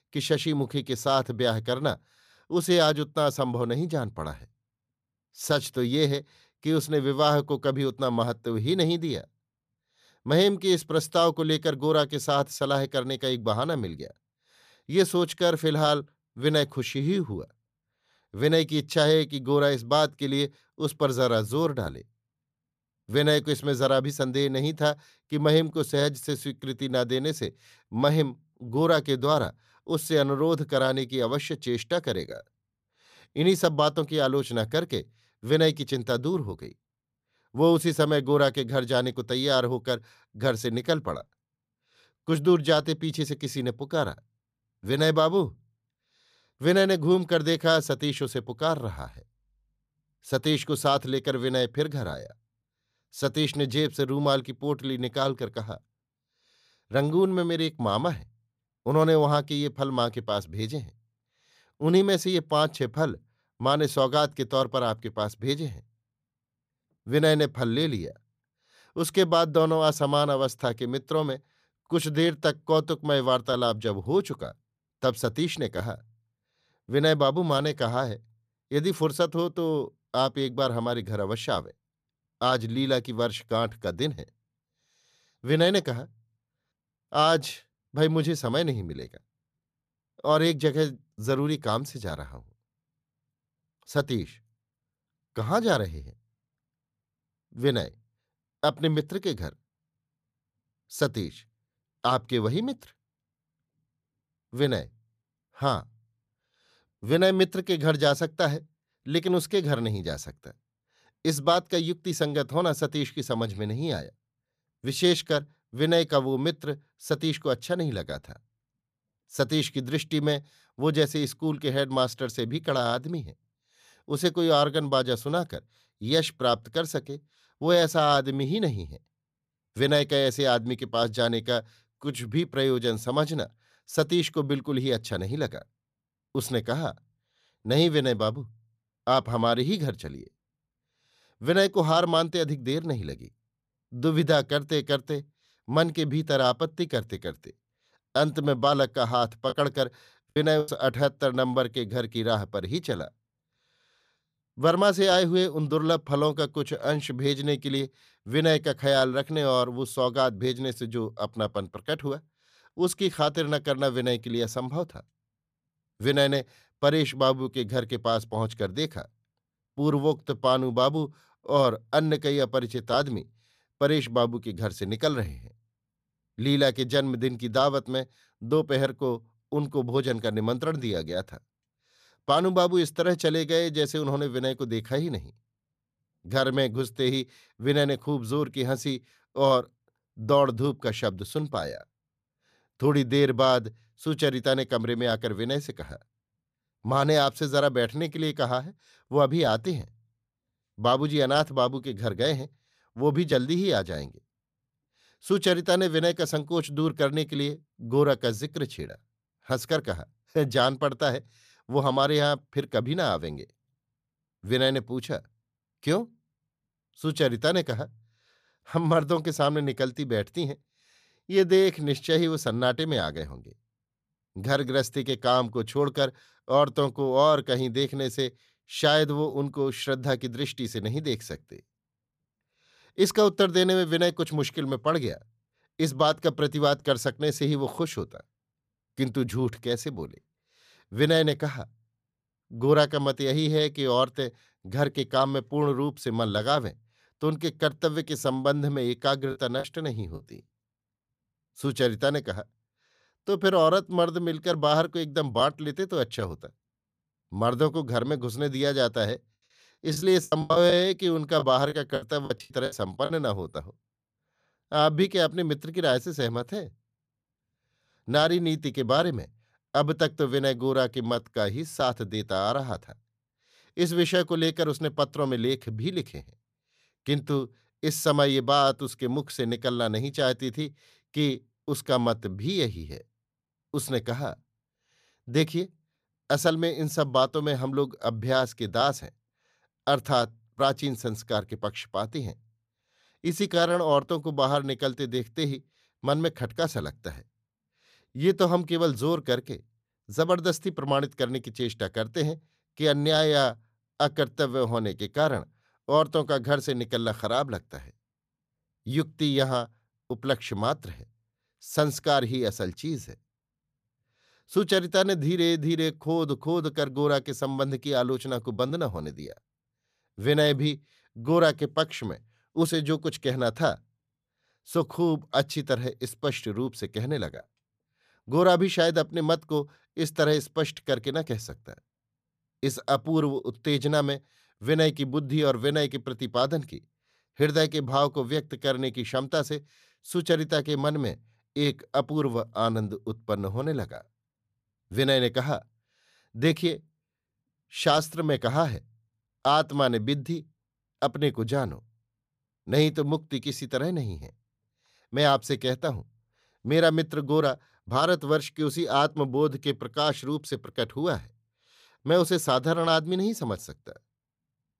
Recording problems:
choppy; very; from 2:30 to 2:31, at 4:09 and from 4:20 to 4:23; 14% of the speech affected

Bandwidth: 14.5 kHz